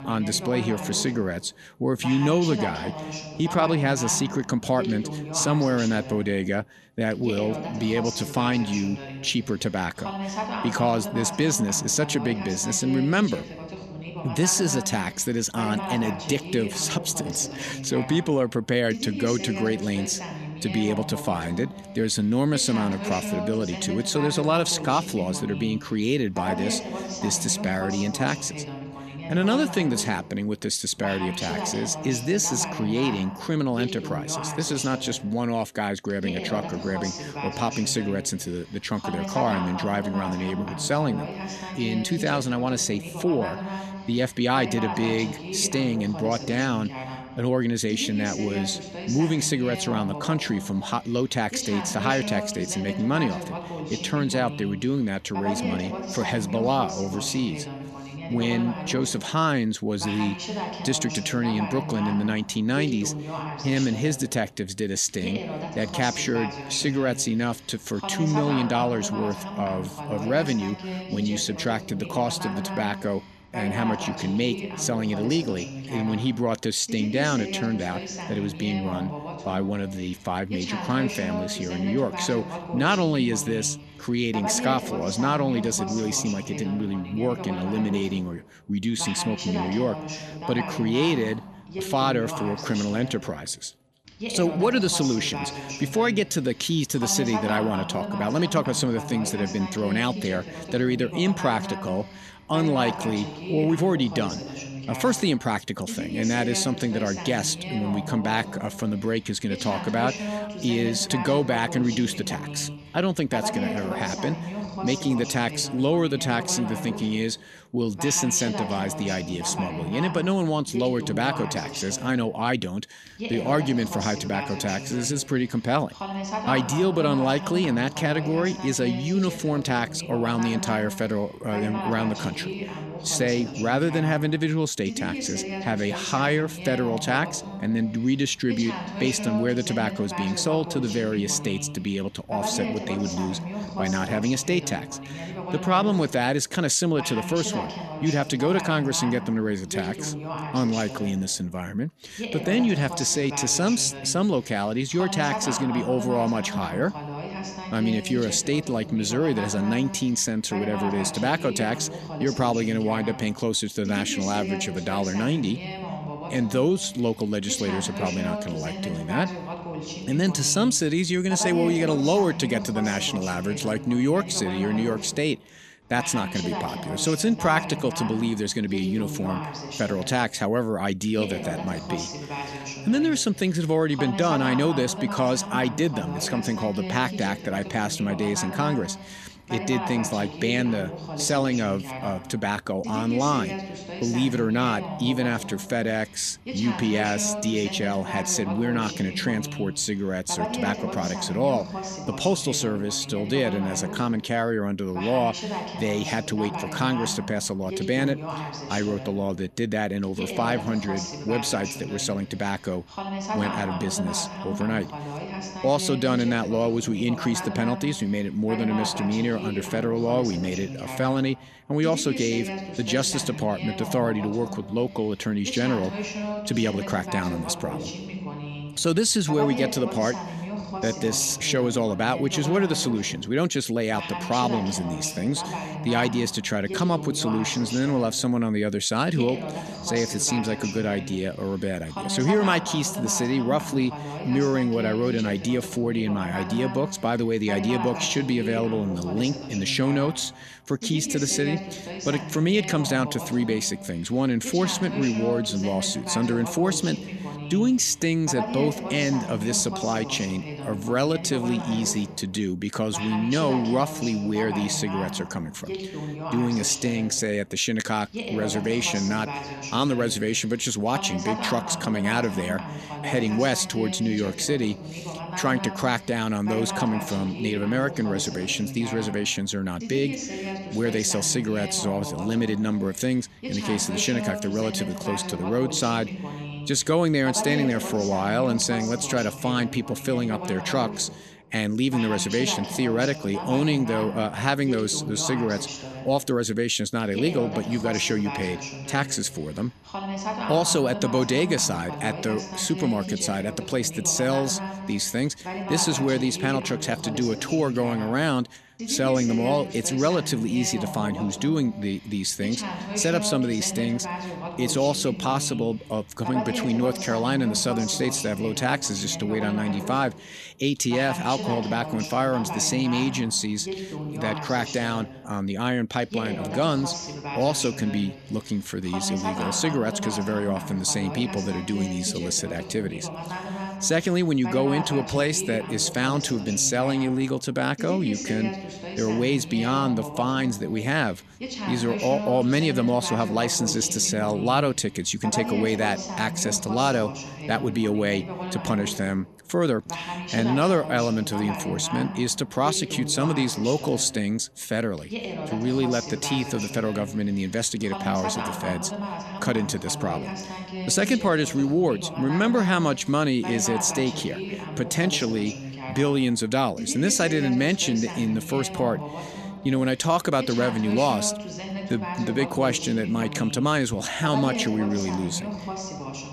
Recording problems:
voice in the background; loud; throughout; 8 dB below the speech

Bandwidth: 14 kHz